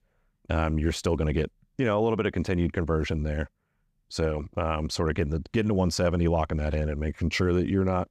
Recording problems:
none

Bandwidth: 15.5 kHz